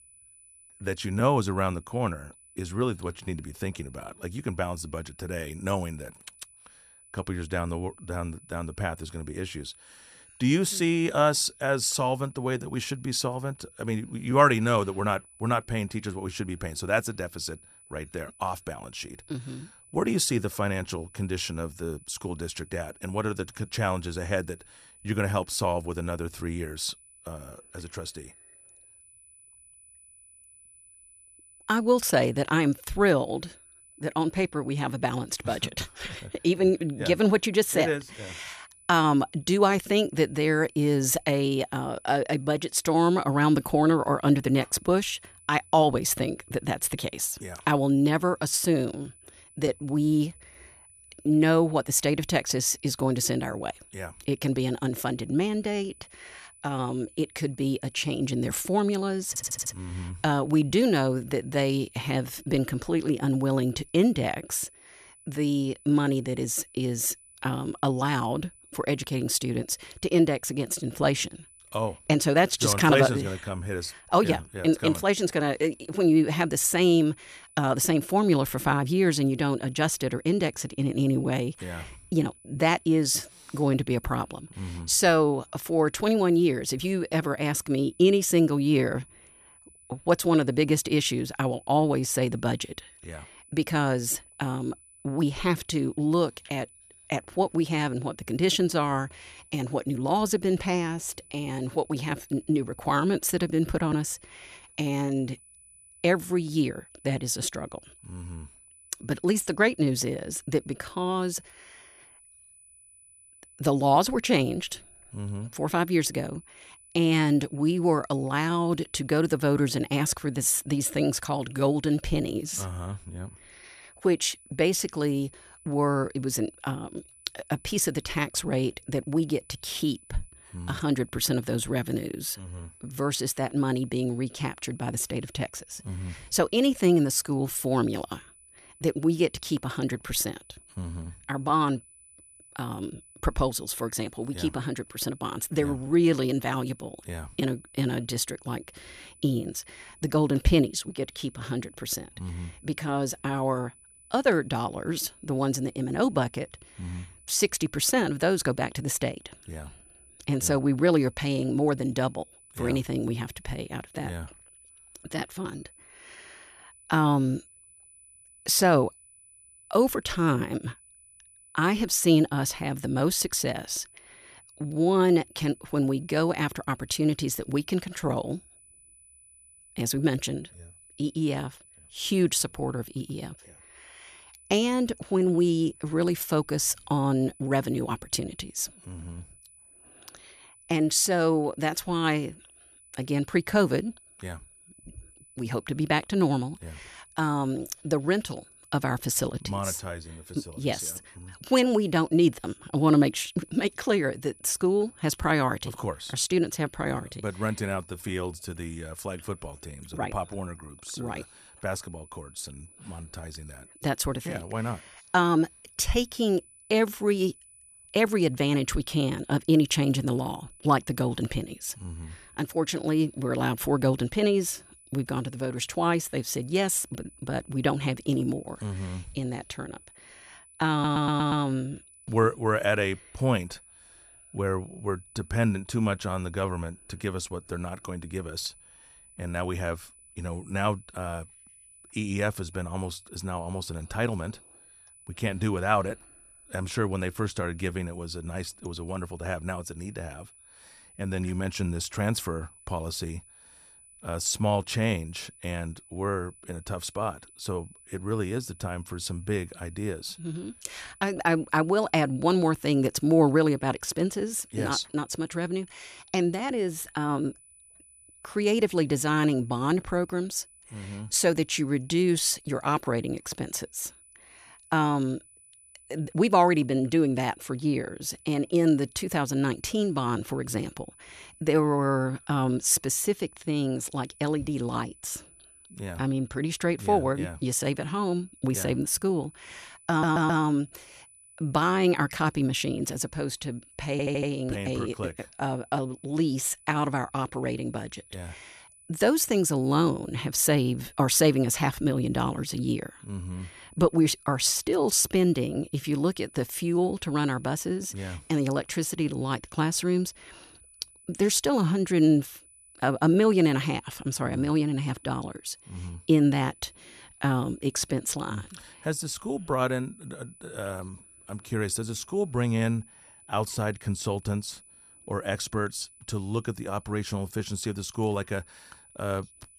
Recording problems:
high-pitched whine; faint; throughout; 10 kHz, 25 dB below the speech
audio stuttering; 4 times, first at 59 s

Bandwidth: 14 kHz